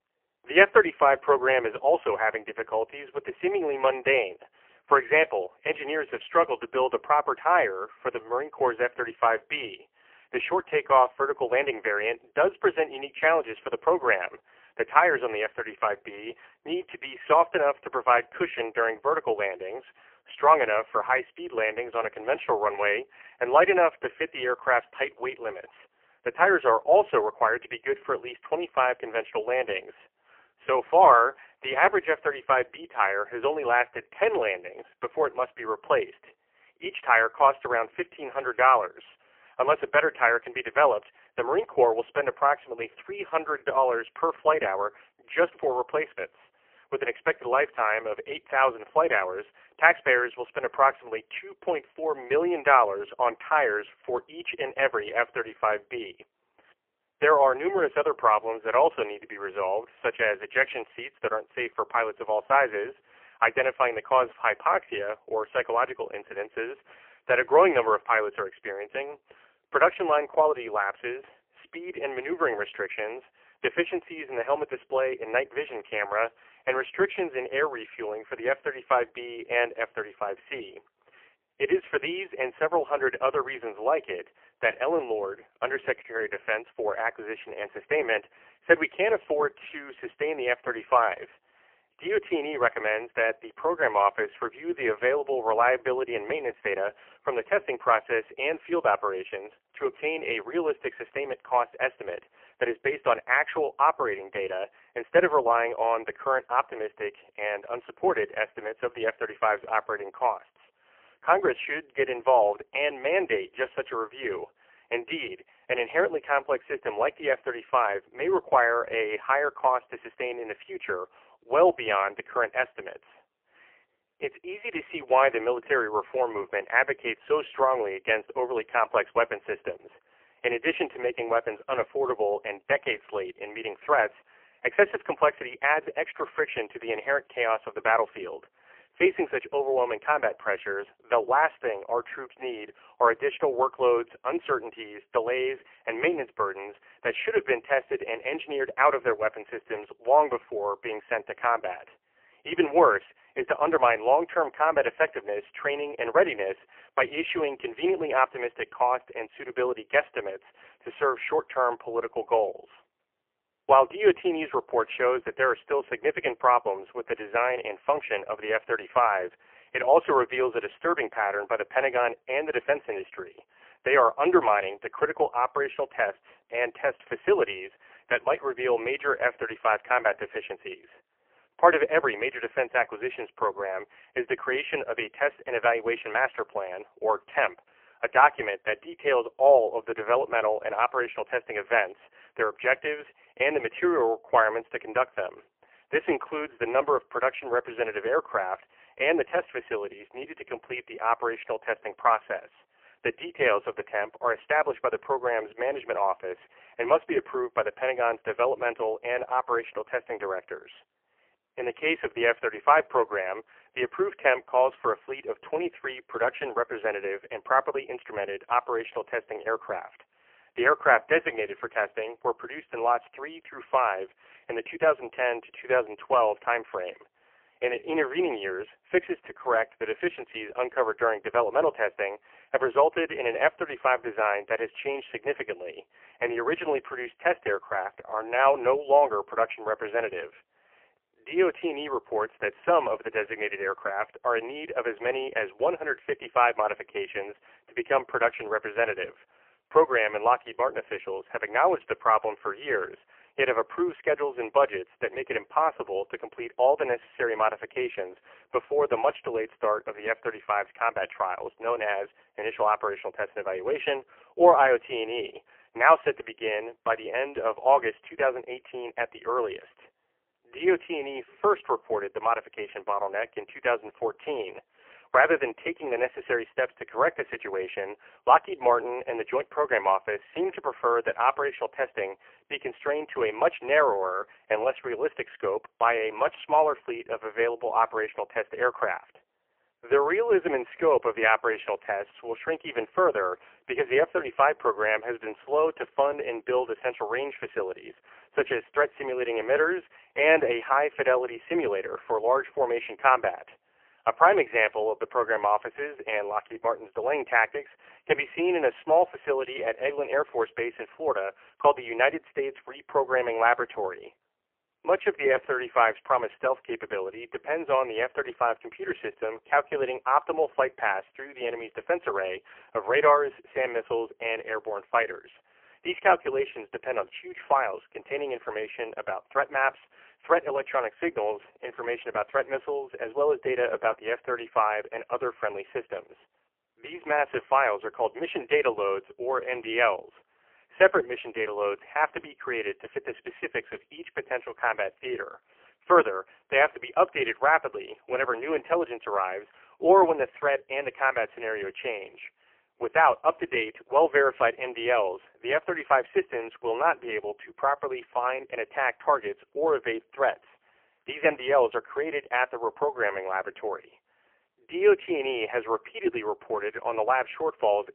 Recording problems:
phone-call audio; poor line; nothing above 3 kHz

